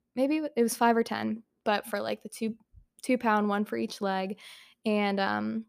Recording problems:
none

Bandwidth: 15 kHz